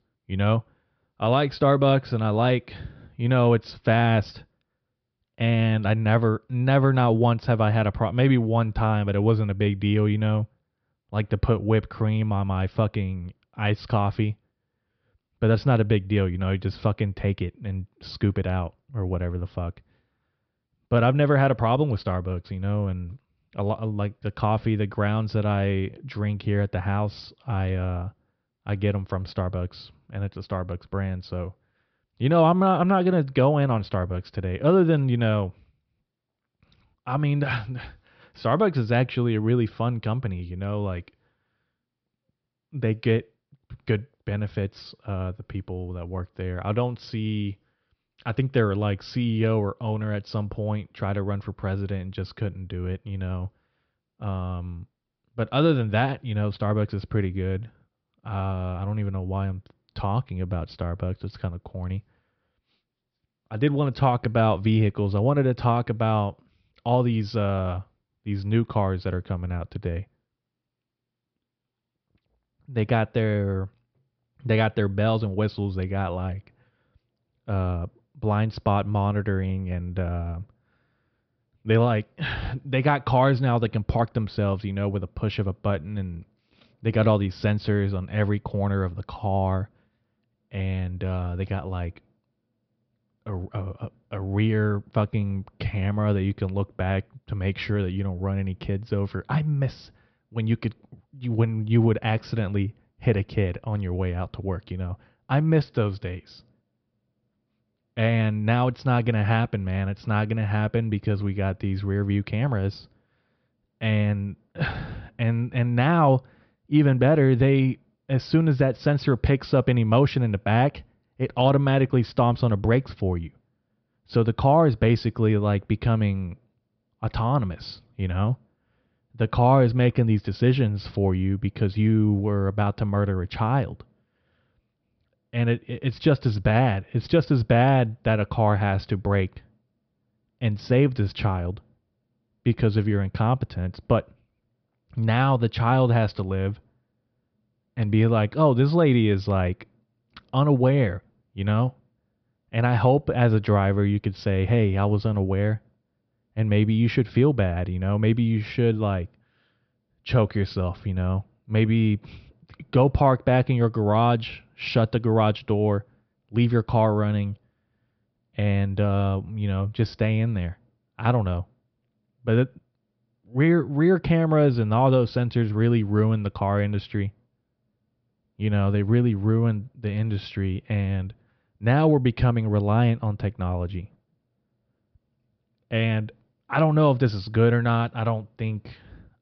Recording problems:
high frequencies cut off; noticeable; nothing above 5.5 kHz

